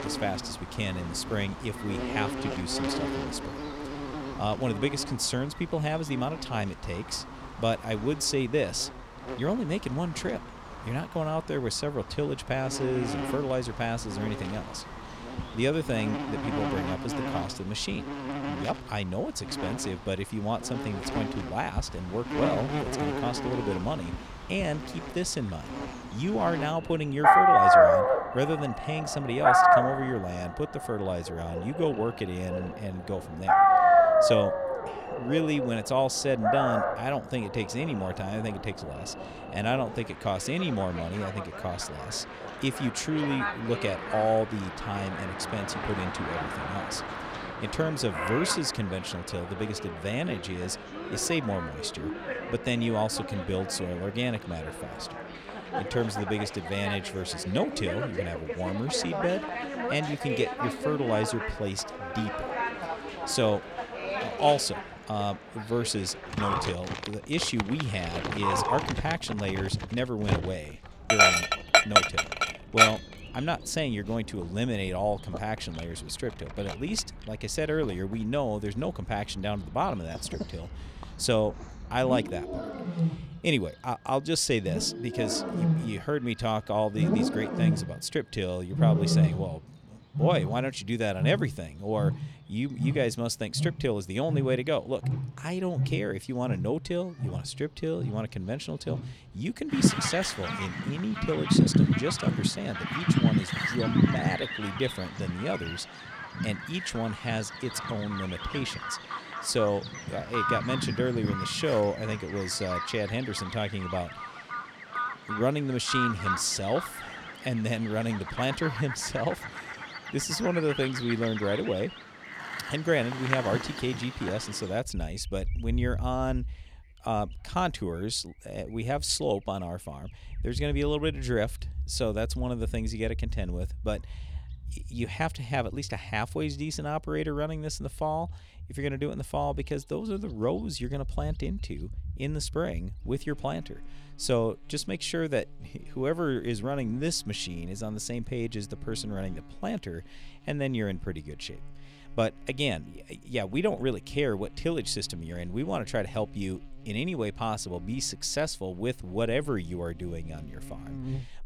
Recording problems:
animal sounds; very loud; throughout; 1 dB above the speech

